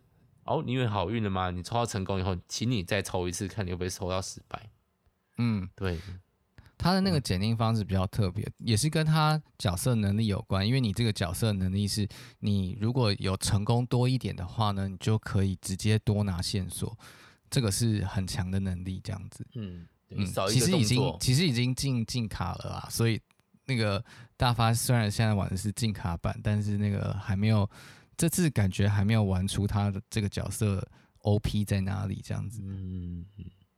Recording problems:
none

